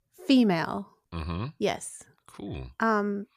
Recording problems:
none

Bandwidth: 15 kHz